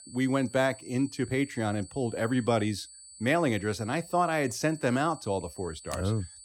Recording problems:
high-pitched whine; noticeable; throughout; 8 kHz, 20 dB below the speech

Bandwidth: 17.5 kHz